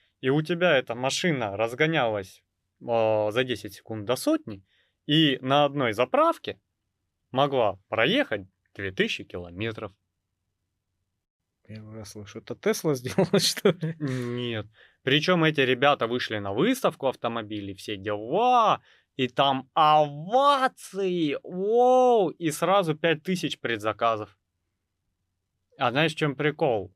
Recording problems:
none

